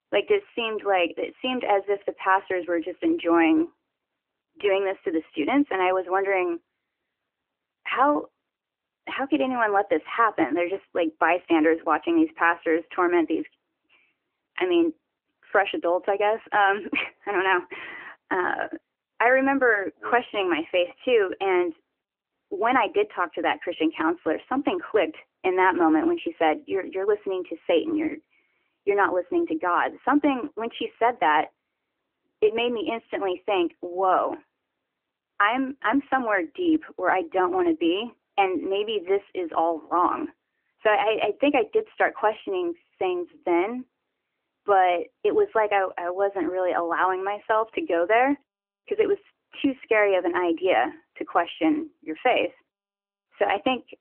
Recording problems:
phone-call audio; nothing above 3 kHz

